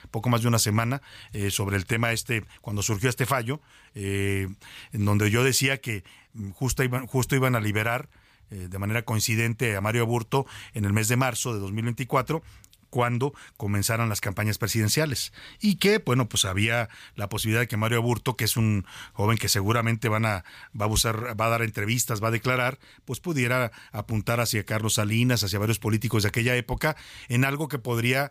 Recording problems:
none

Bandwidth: 15 kHz